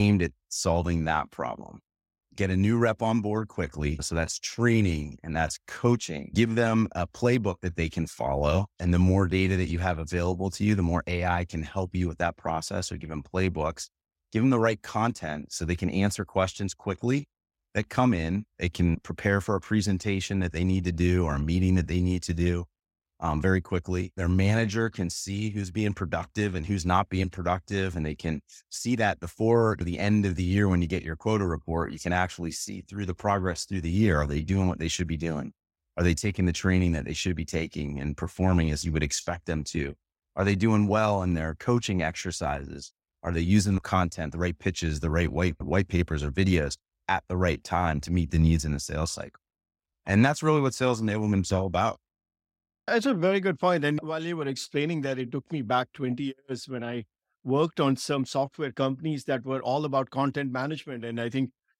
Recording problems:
abrupt cut into speech; at the start

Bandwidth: 16 kHz